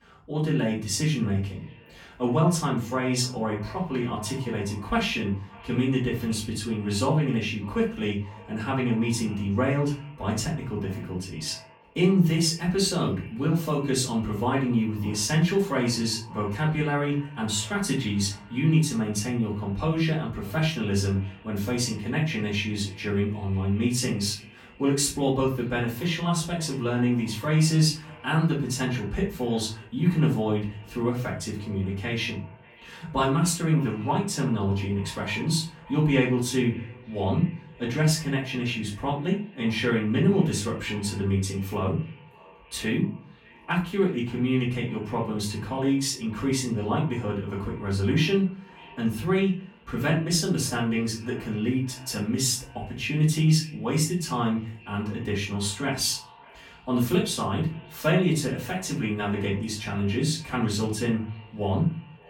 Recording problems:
off-mic speech; far
echo of what is said; faint; throughout; 590 ms later, 25 dB below the speech
room echo; slight; dies away in 0.4 s

